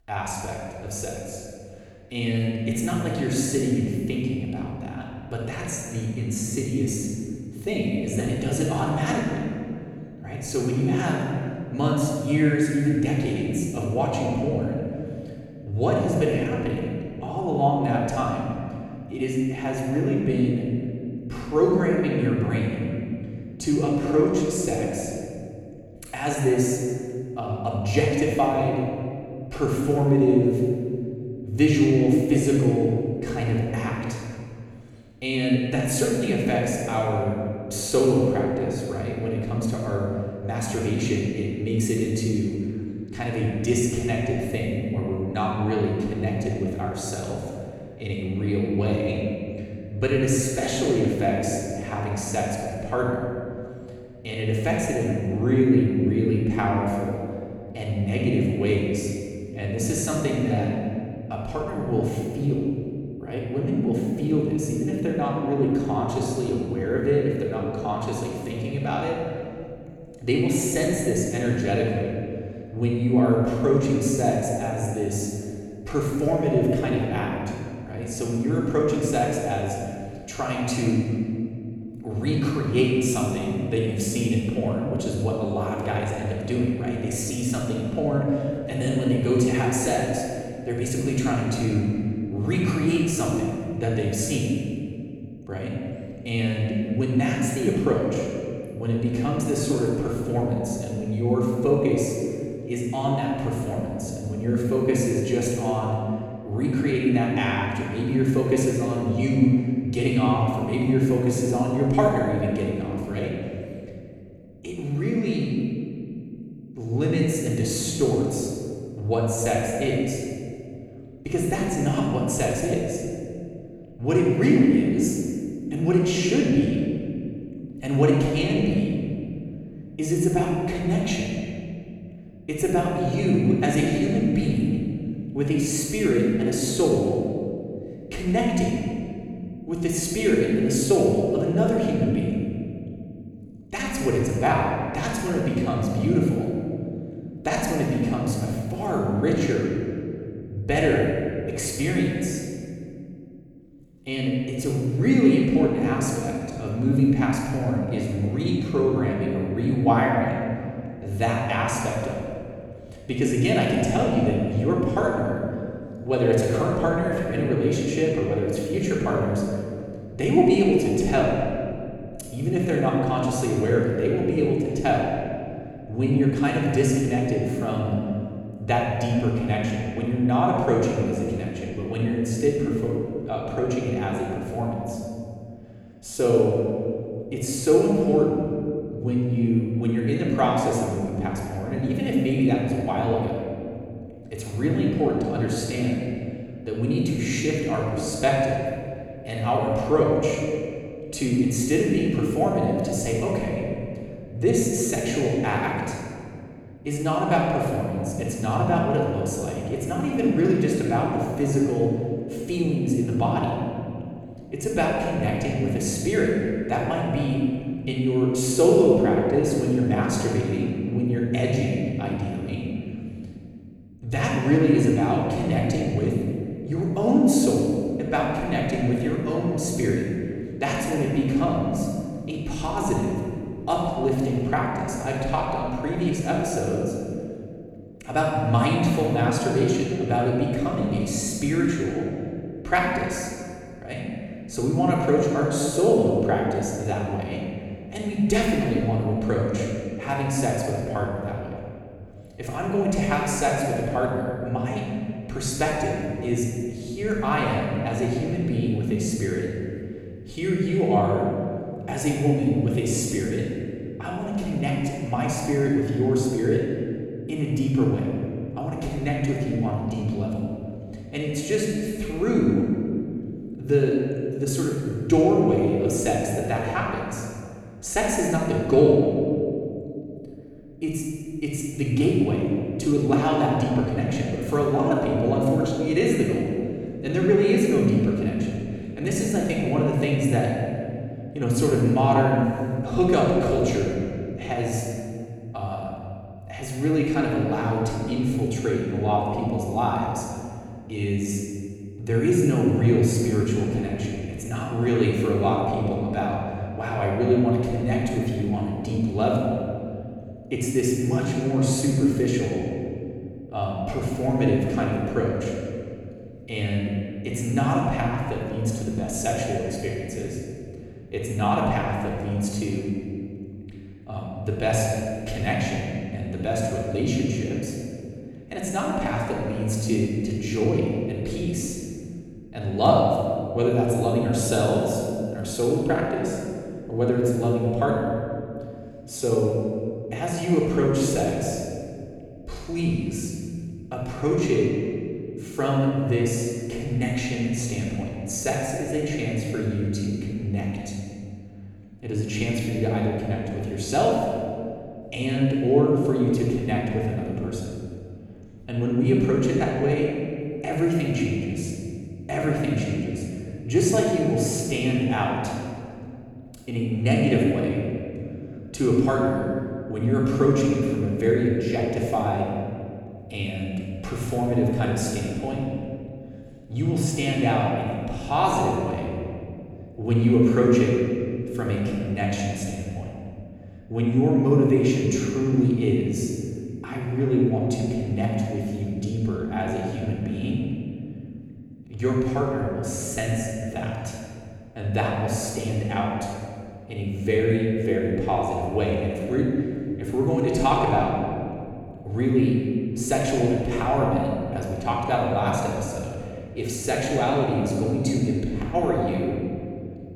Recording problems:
room echo; strong; dies away in 2.2 s
off-mic speech; far

